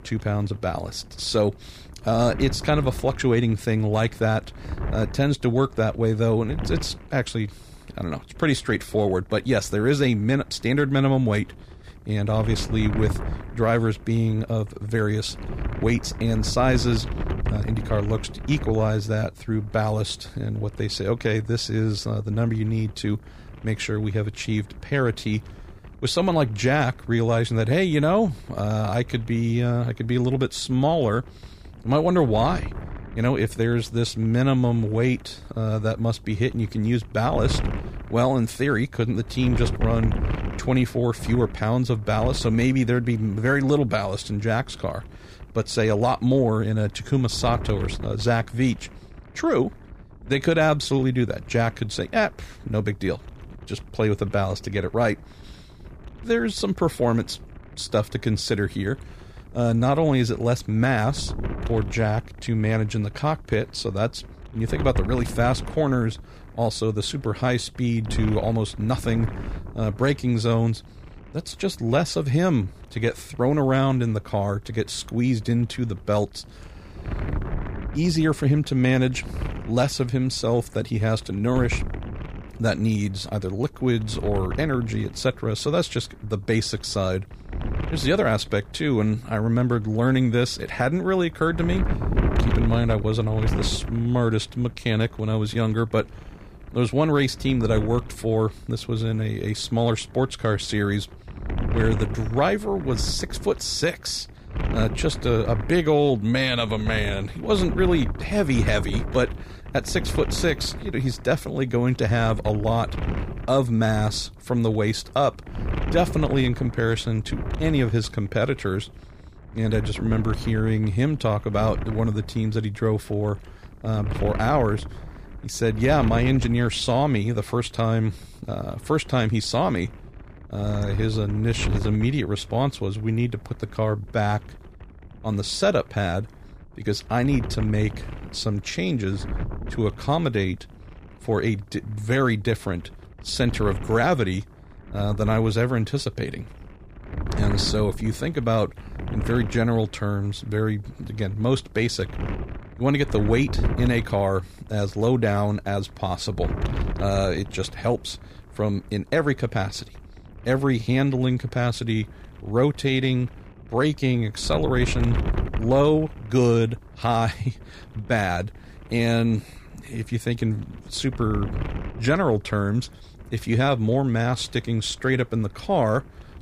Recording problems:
wind noise on the microphone; occasional gusts; 15 dB below the speech

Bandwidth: 15 kHz